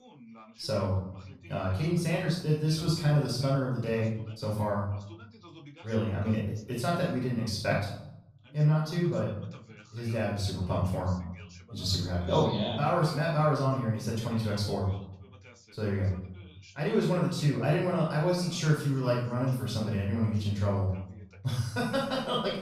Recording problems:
off-mic speech; far
room echo; noticeable; dies away in 0.6 s
voice in the background; faint; throughout; 25 dB below the speech

